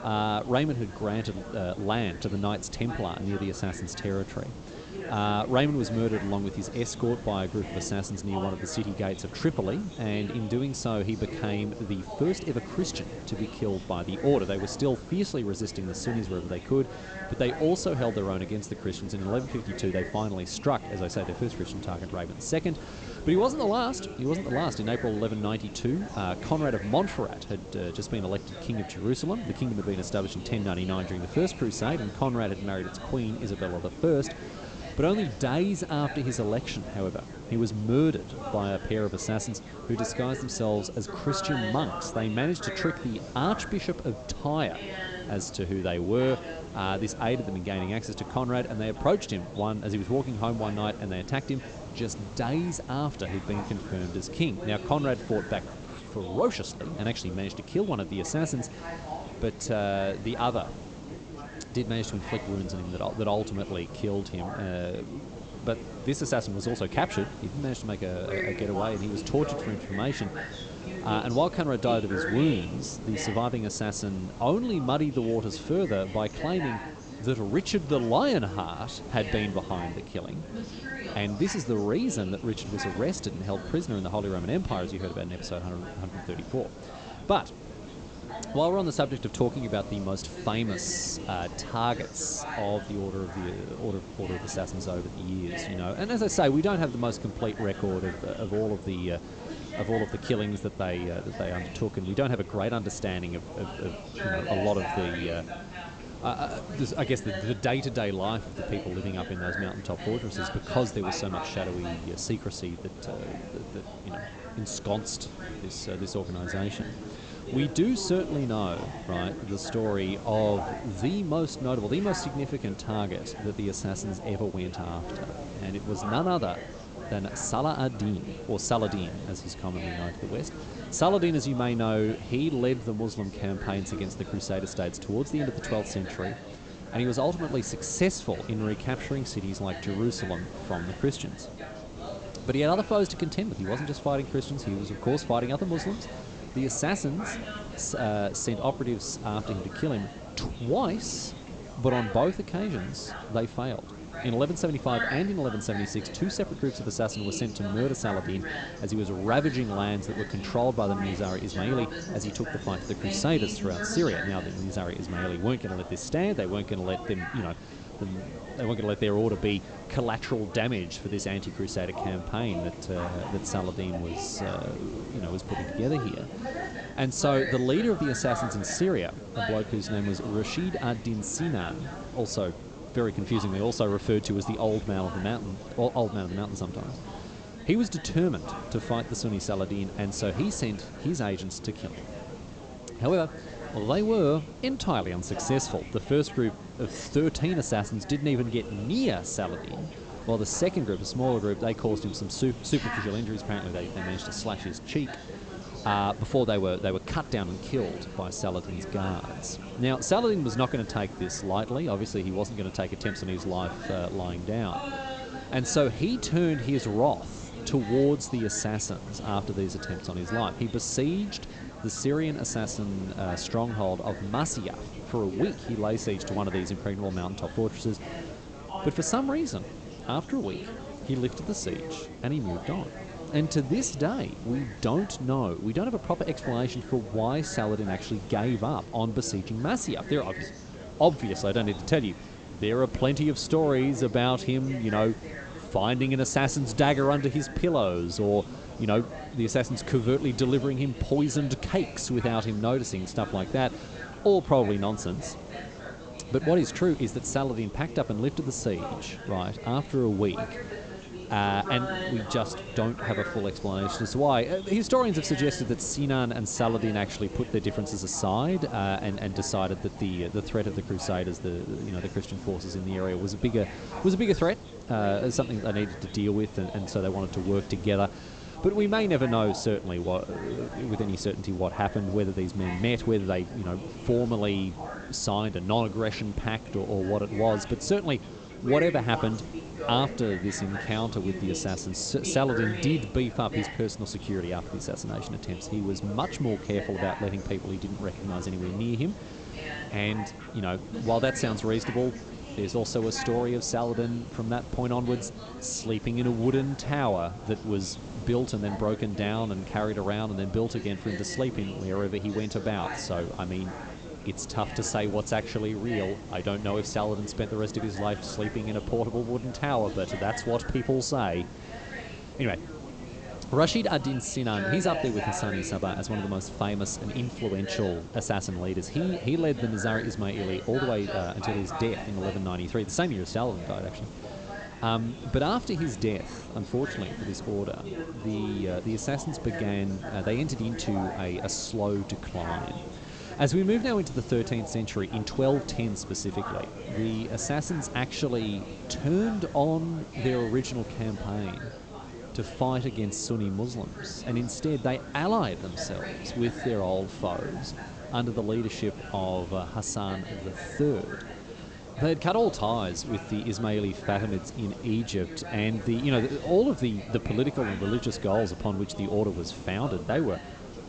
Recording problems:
high frequencies cut off; noticeable; nothing above 8 kHz
background chatter; noticeable; throughout; 3 voices, 10 dB below the speech
hiss; noticeable; throughout; 15 dB below the speech

